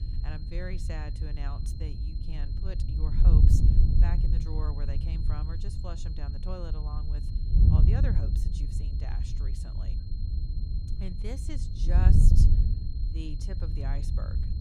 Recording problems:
wind noise on the microphone; heavy; 1 dB above the speech
high-pitched whine; noticeable; throughout; 4 kHz, 10 dB below the speech

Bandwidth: 15 kHz